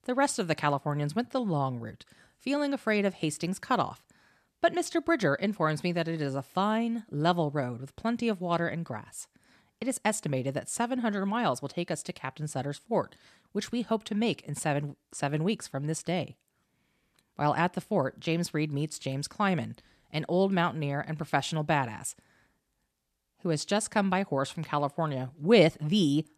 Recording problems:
none

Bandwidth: 14 kHz